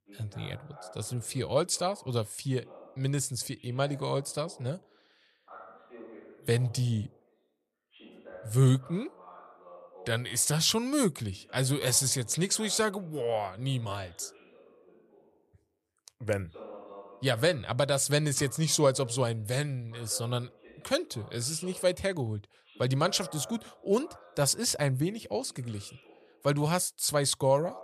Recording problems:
voice in the background; faint; throughout; 20 dB below the speech

